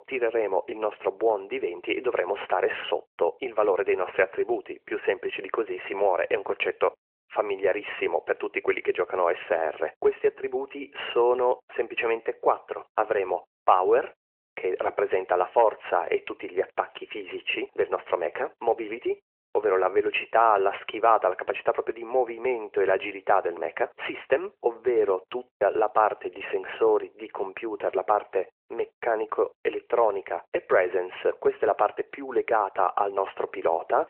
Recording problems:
phone-call audio; nothing above 3 kHz

